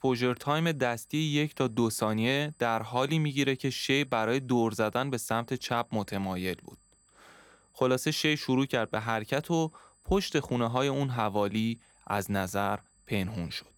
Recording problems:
high-pitched whine; faint; throughout; 8 kHz, 35 dB below the speech

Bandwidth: 17.5 kHz